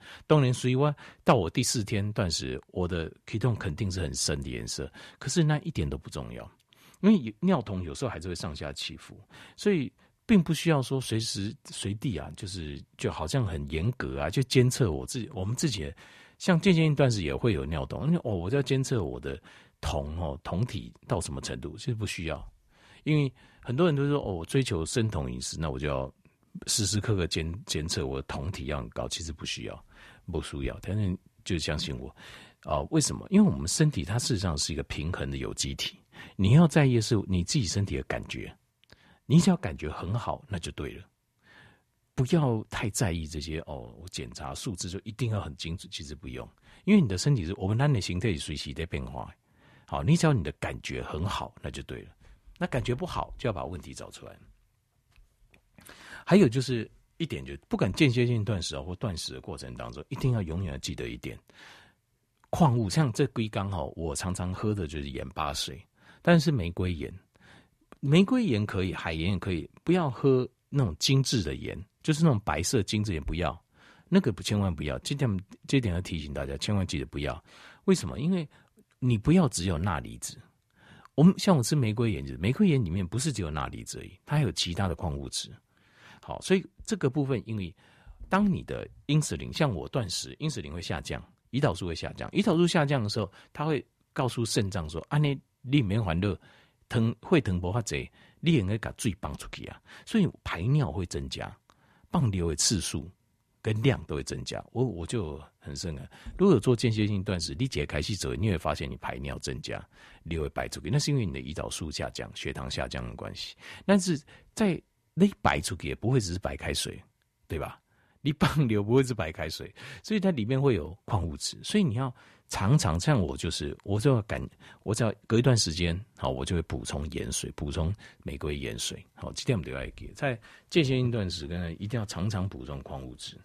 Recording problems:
none

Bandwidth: 14 kHz